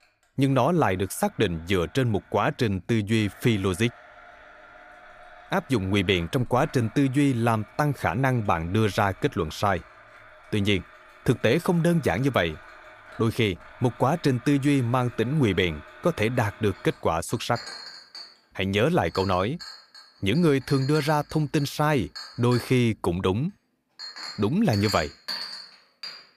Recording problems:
household noises; noticeable; throughout; 15 dB below the speech

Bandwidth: 15 kHz